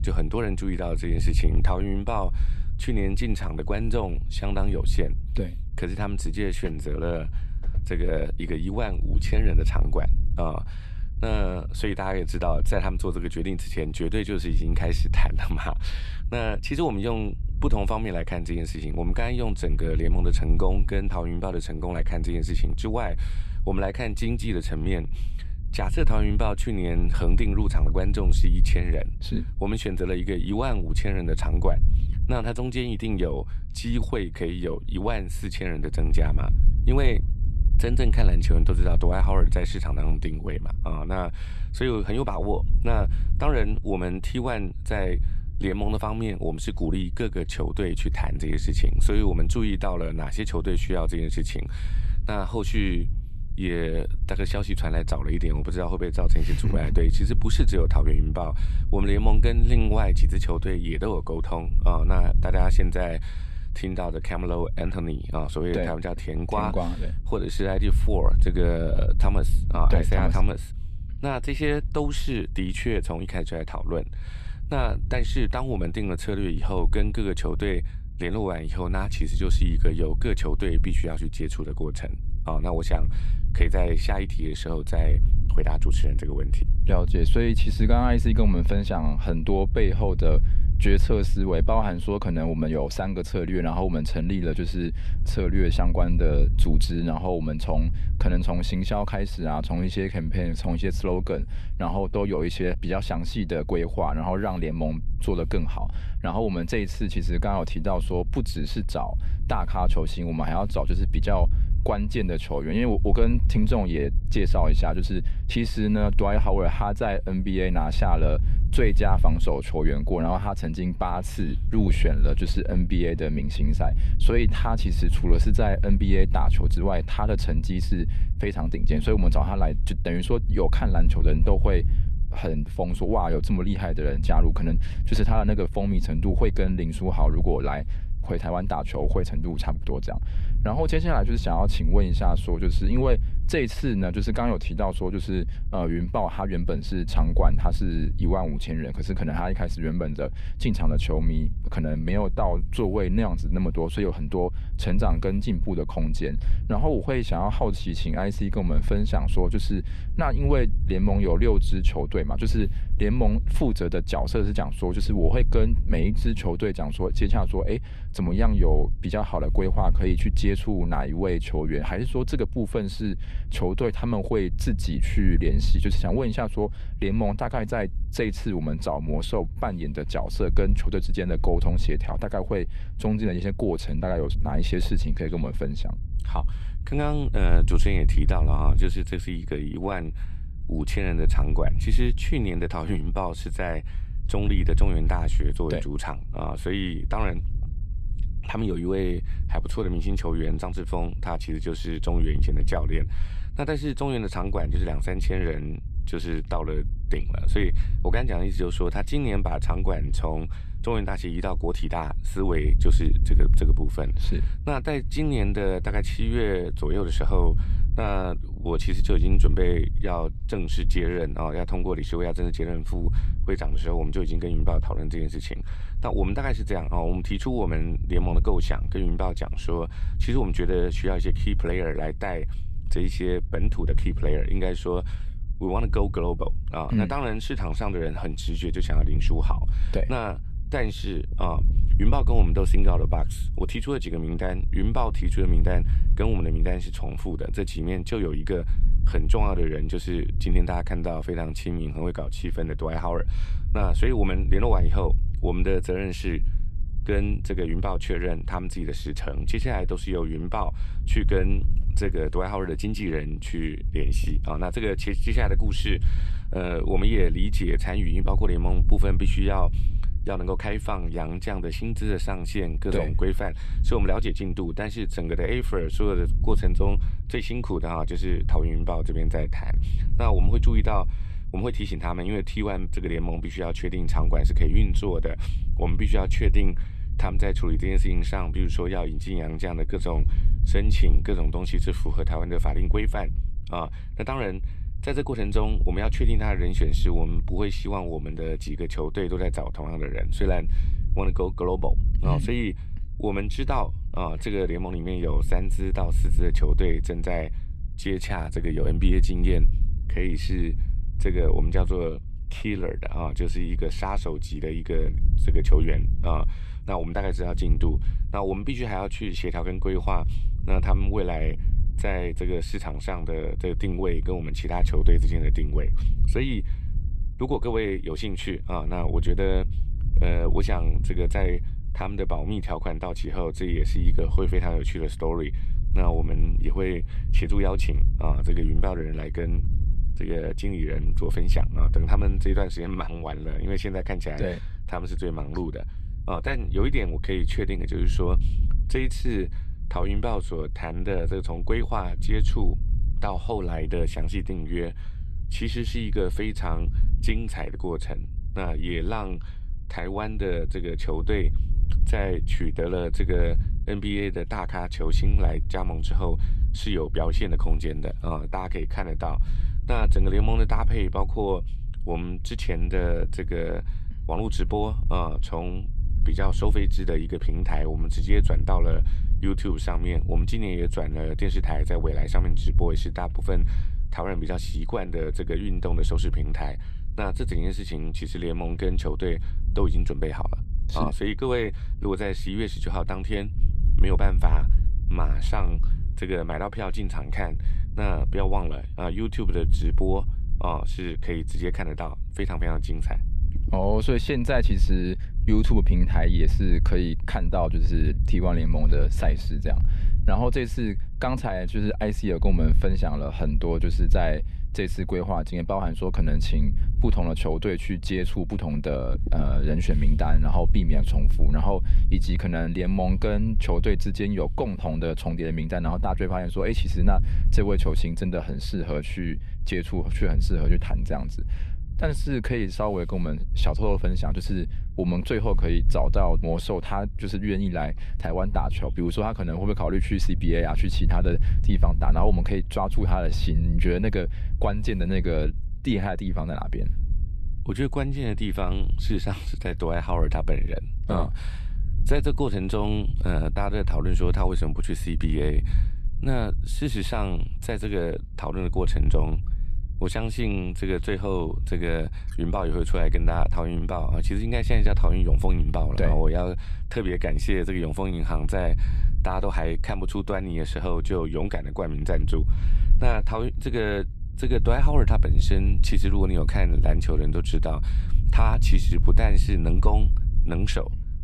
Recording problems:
low rumble; noticeable; throughout; 15 dB below the speech

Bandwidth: 13.5 kHz